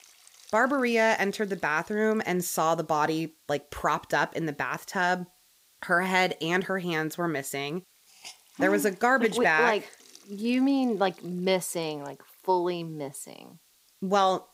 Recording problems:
hiss; faint; throughout; 30 dB below the speech

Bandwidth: 15.5 kHz